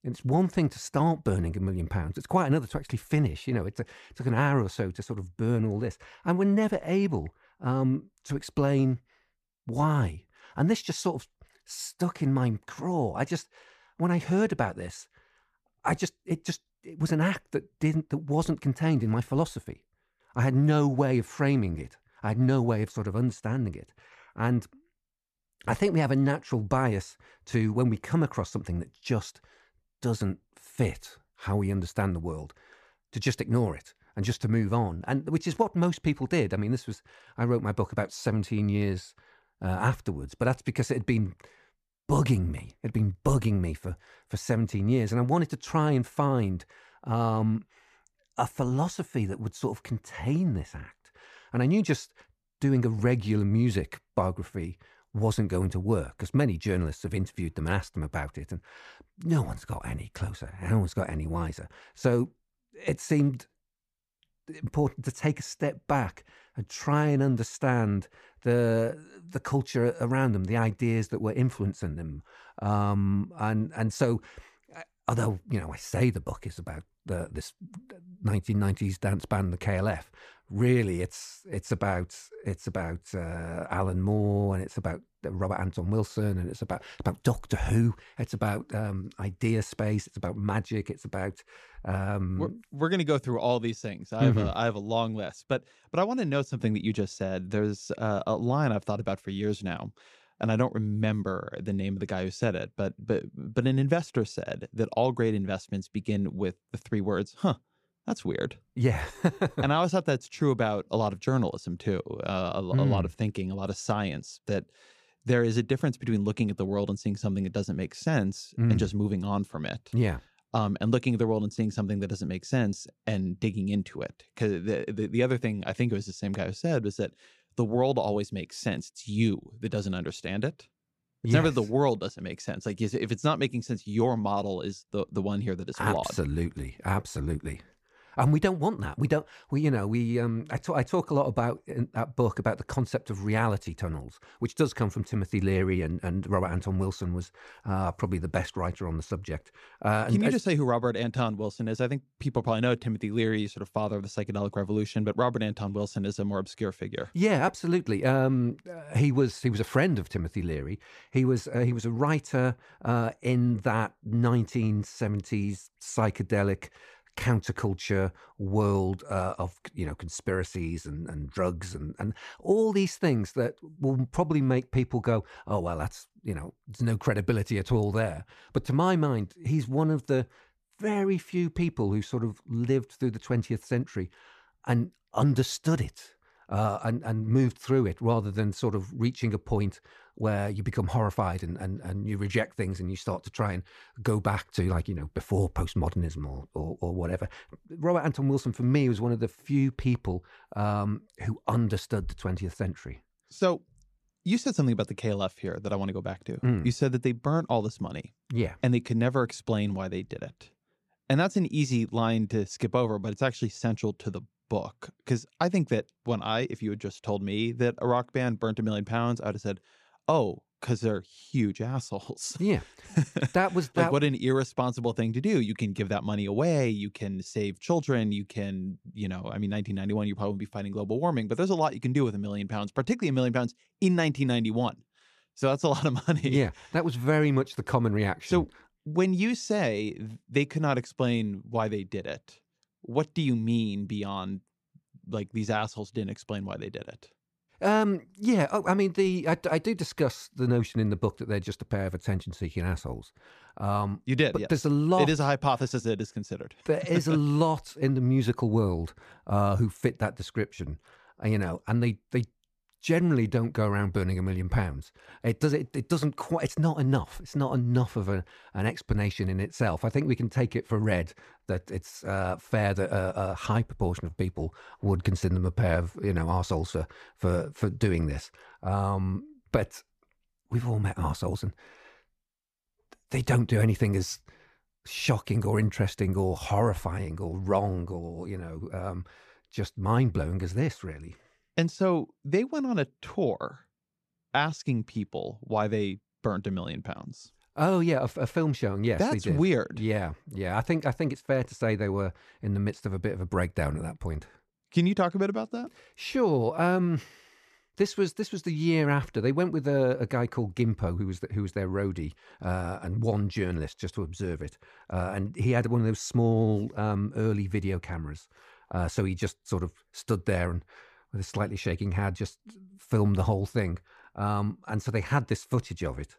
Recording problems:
none

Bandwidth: 14.5 kHz